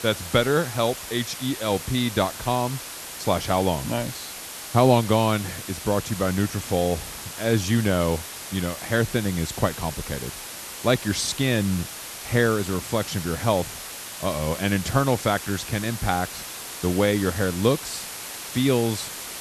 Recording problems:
hiss; loud; throughout; 9 dB below the speech

